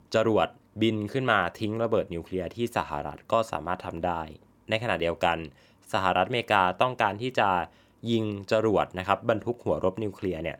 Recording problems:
none

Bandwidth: 17.5 kHz